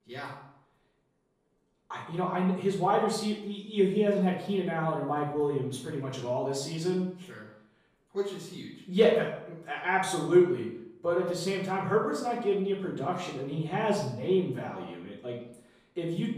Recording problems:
off-mic speech; far
room echo; noticeable; dies away in 0.6 s

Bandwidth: 14.5 kHz